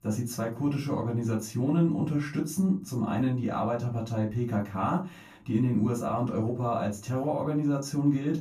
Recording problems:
off-mic speech; far
room echo; very slight; dies away in 0.3 s

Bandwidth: 14.5 kHz